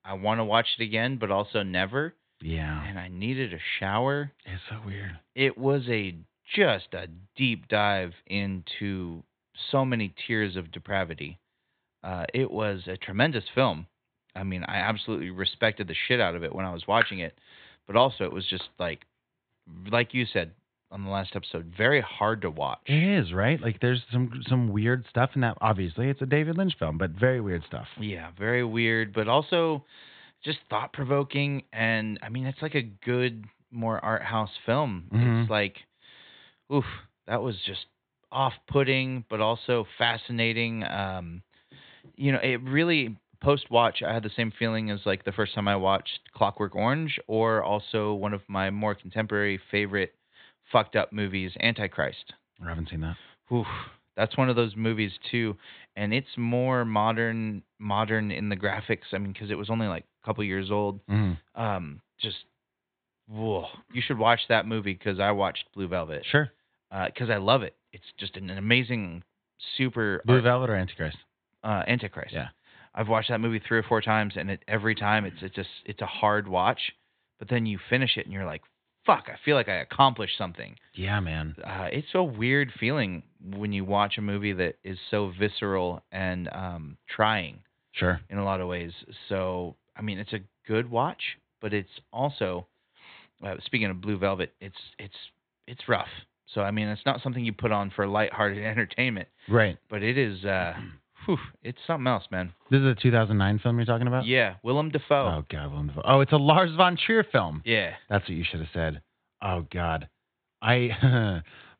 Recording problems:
high frequencies cut off; severe; nothing above 4 kHz

